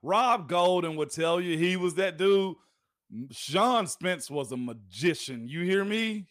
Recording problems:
none

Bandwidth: 15 kHz